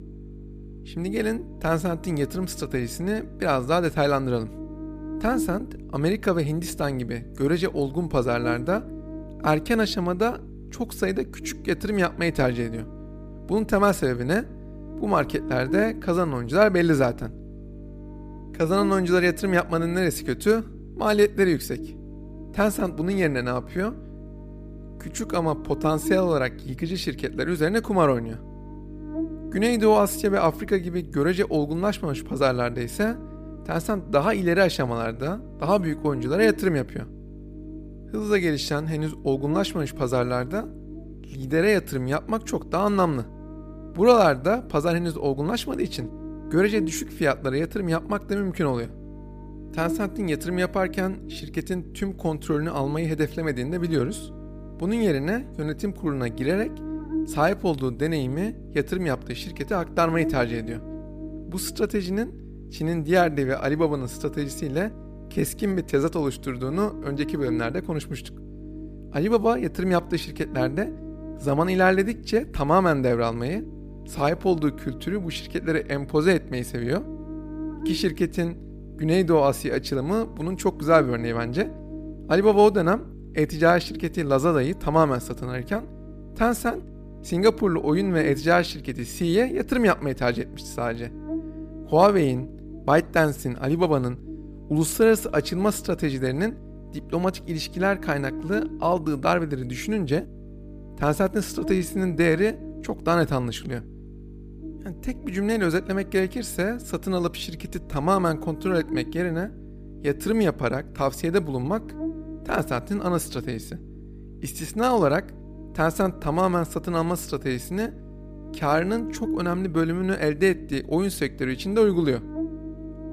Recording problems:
electrical hum; noticeable; throughout; 50 Hz, 15 dB below the speech

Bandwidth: 15 kHz